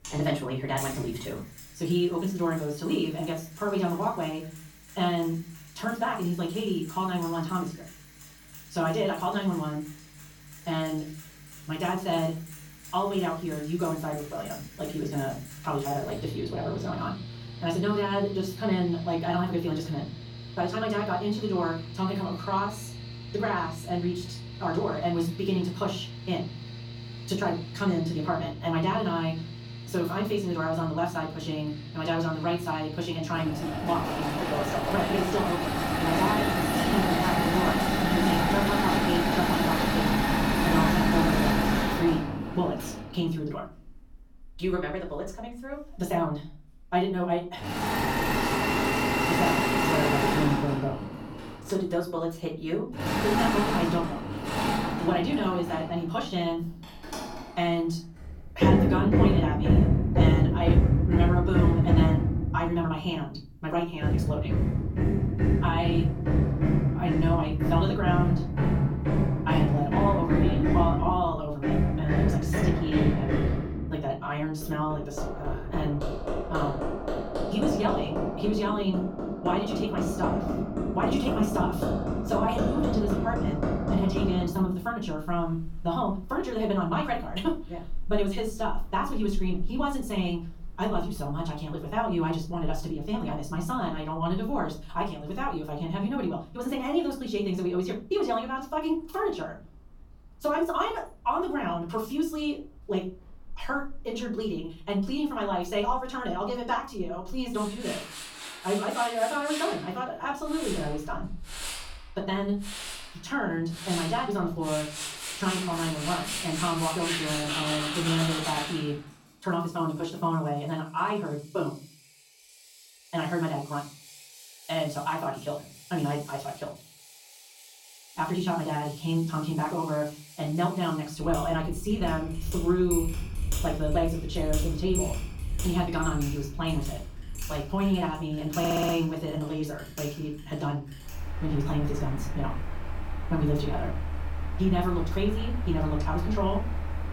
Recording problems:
off-mic speech; far
wrong speed, natural pitch; too fast; 1.6 times normal speed
room echo; slight; dies away in 0.3 s
machinery noise; very loud; throughout; 1 dB above the speech
audio stuttering; at 2:19

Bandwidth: 17.5 kHz